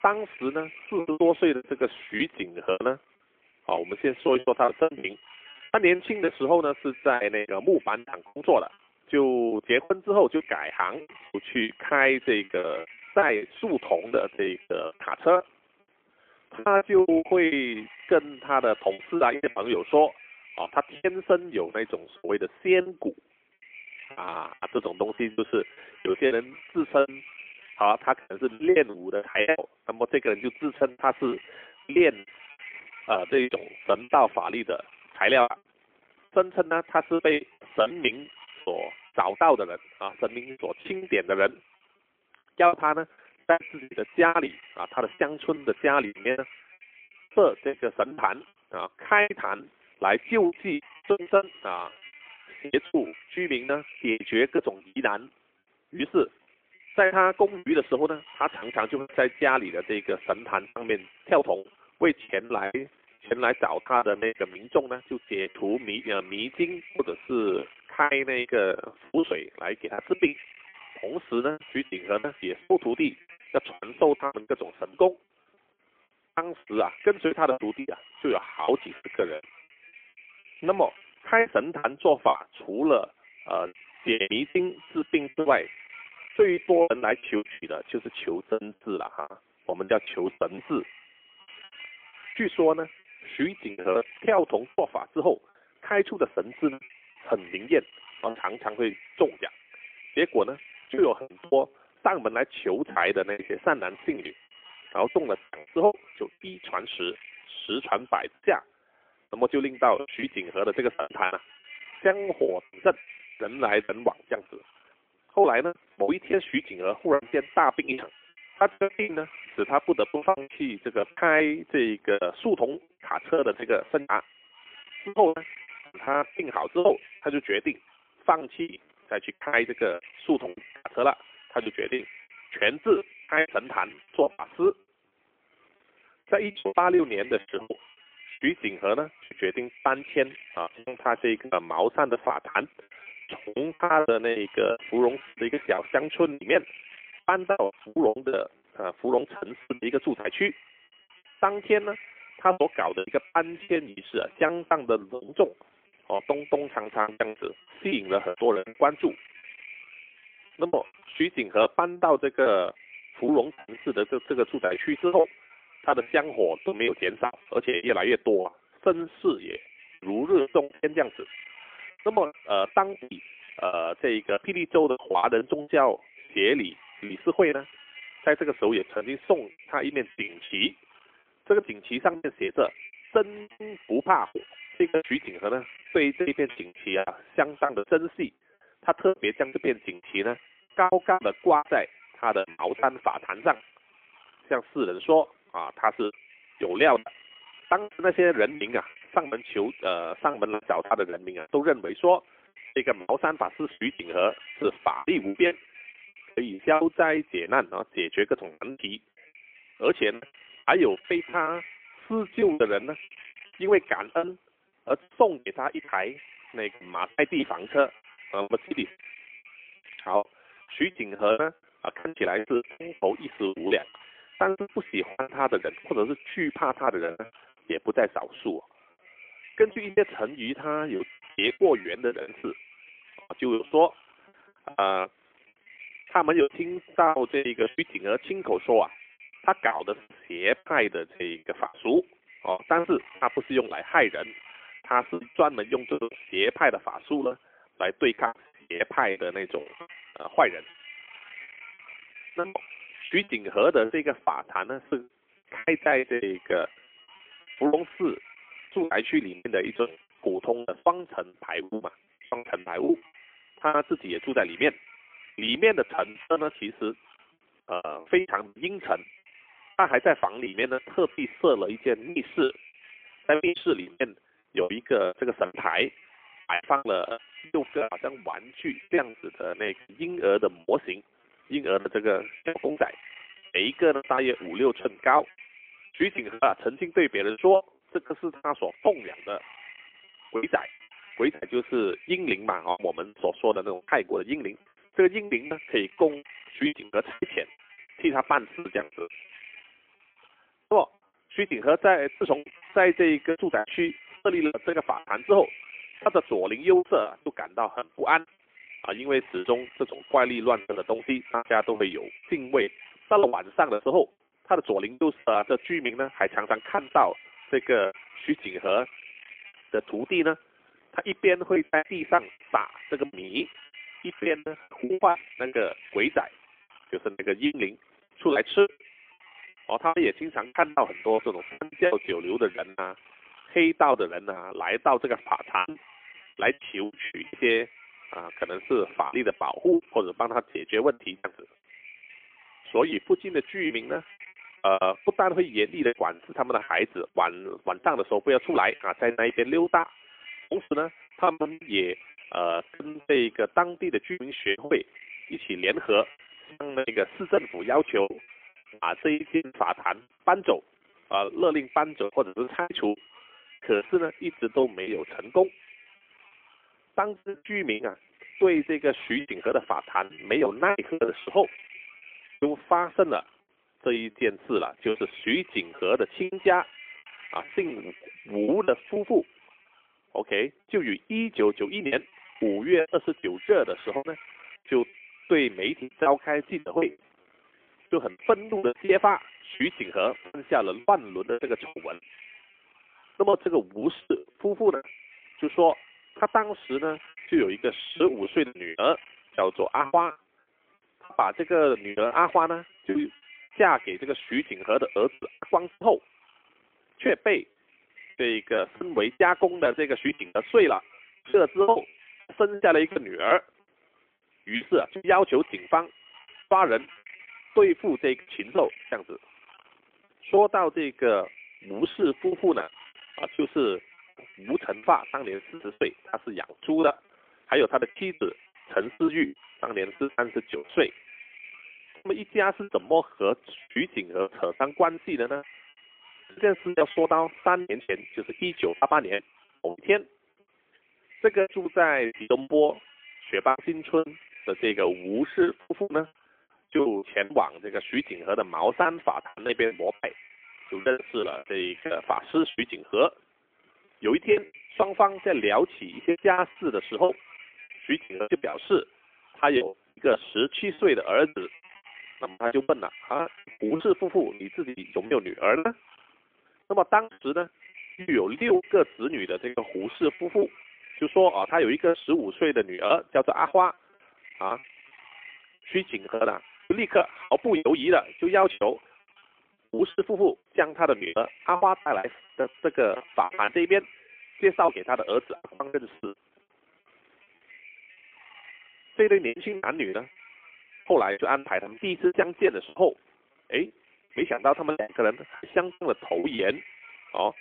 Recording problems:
phone-call audio; poor line; nothing above 3.5 kHz
wind noise on the microphone; occasional gusts; 20 dB below the speech
choppy; very; 15% of the speech affected

